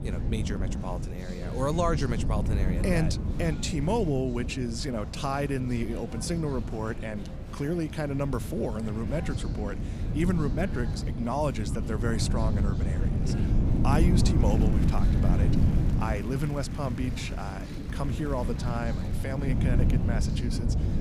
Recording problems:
wind noise on the microphone; heavy; 7 dB below the speech
murmuring crowd; noticeable; throughout; 15 dB below the speech

